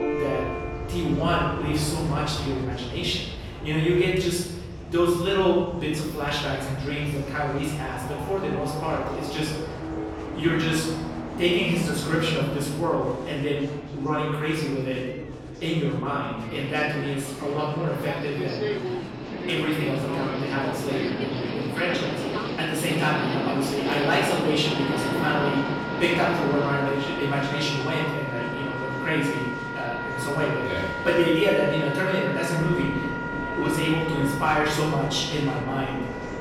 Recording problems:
off-mic speech; far
room echo; noticeable; dies away in 1 s
background music; loud; throughout; 8 dB below the speech
train or aircraft noise; loud; throughout; 8 dB below the speech
murmuring crowd; noticeable; throughout; 20 dB below the speech

